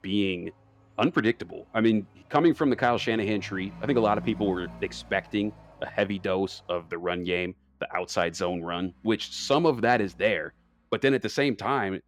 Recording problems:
traffic noise; noticeable; throughout; 20 dB below the speech

